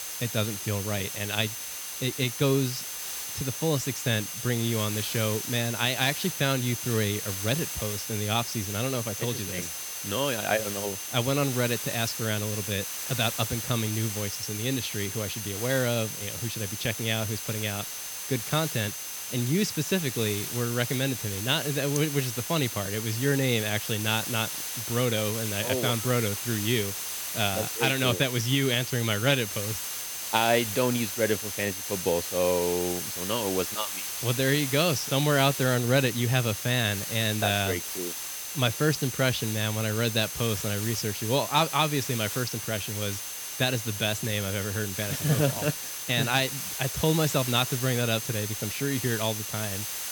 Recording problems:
hiss; loud; throughout; 5 dB below the speech
high-pitched whine; noticeable; throughout; 6.5 kHz, 10 dB below the speech
crackling; very faint; at 36 s and from 37 to 39 s; 25 dB below the speech

